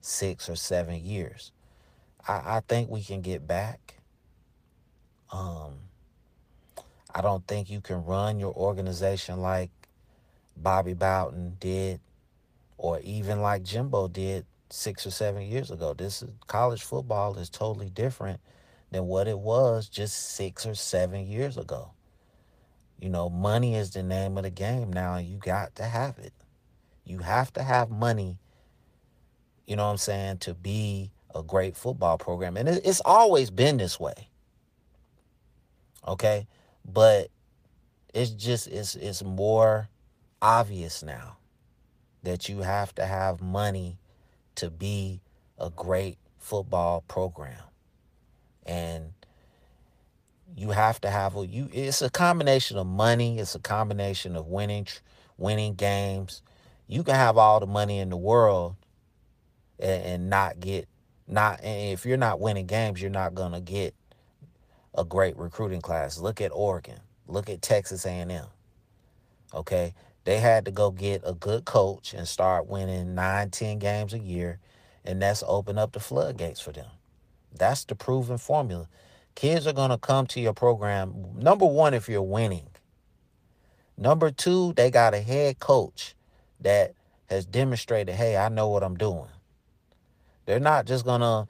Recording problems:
garbled, watery; slightly; nothing above 15 kHz

